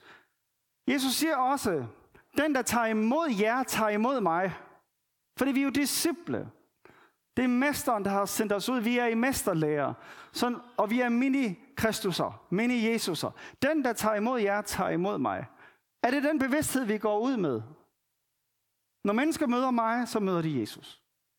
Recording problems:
squashed, flat; heavily

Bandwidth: 18 kHz